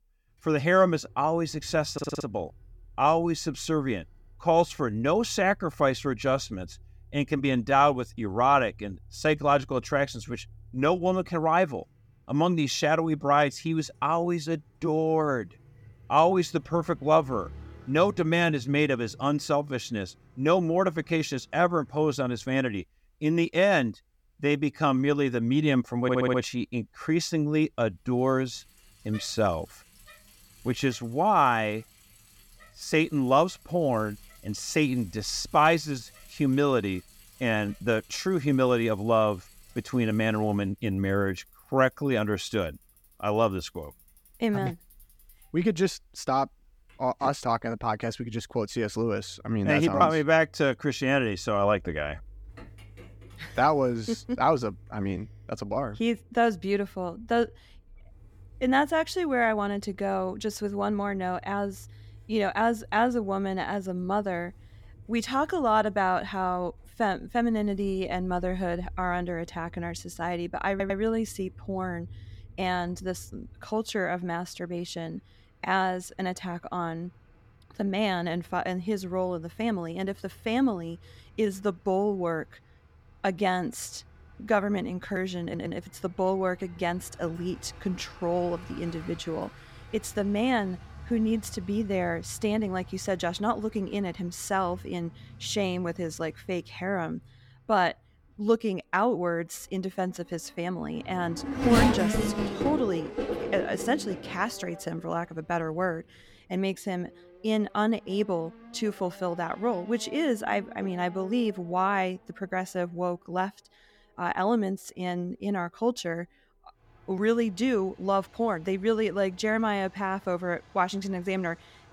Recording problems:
traffic noise; noticeable; throughout; 15 dB below the speech
audio stuttering; 4 times, first at 2 s

